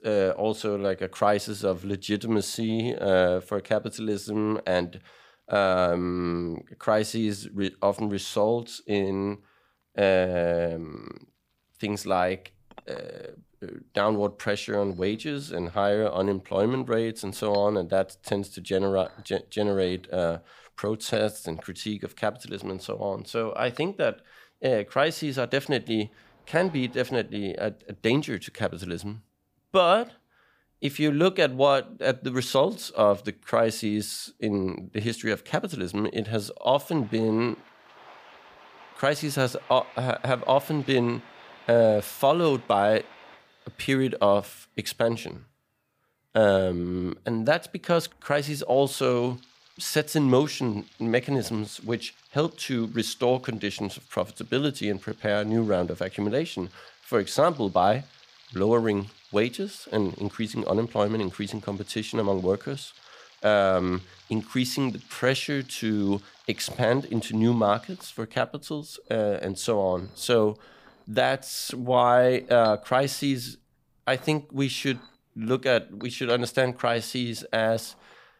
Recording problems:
household noises; faint; throughout; 25 dB below the speech

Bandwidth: 15 kHz